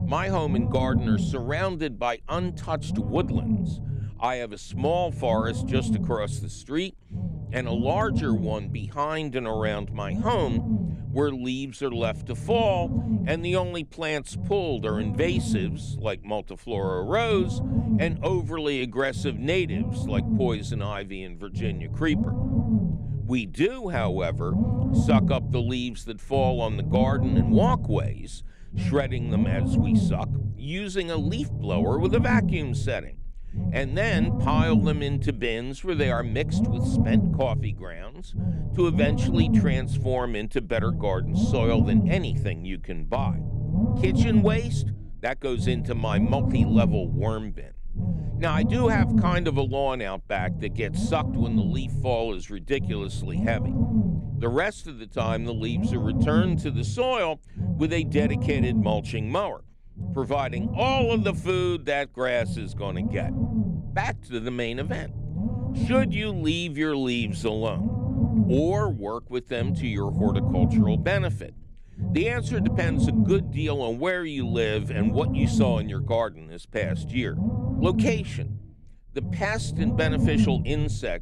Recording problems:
low rumble; loud; throughout; 6 dB below the speech

